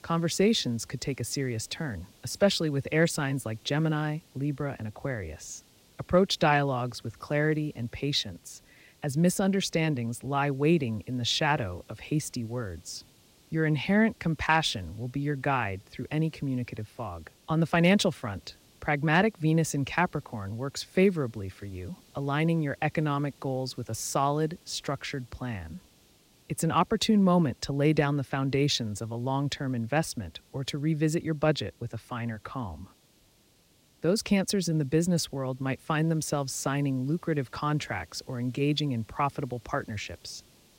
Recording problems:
hiss; faint; throughout; 30 dB below the speech

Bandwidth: 16 kHz